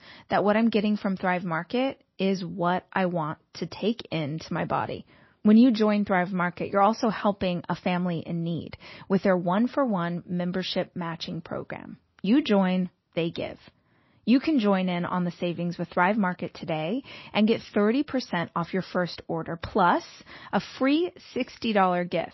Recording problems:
garbled, watery; slightly; nothing above 6 kHz

